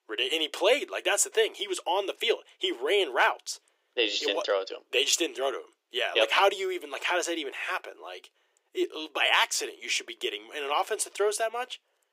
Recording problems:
thin; very; fading below 350 Hz

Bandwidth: 15.5 kHz